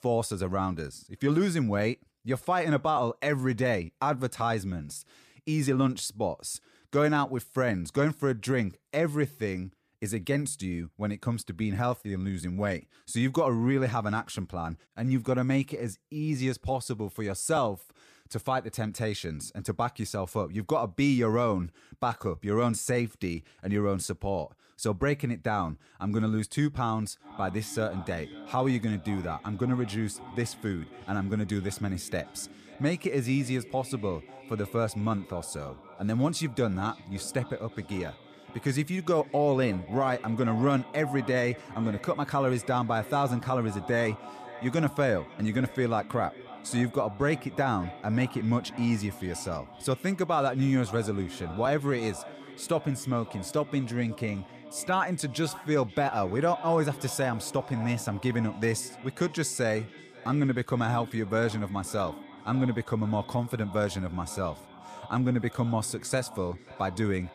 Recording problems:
echo of what is said; noticeable; from 27 s on; 540 ms later, 15 dB below the speech

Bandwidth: 14.5 kHz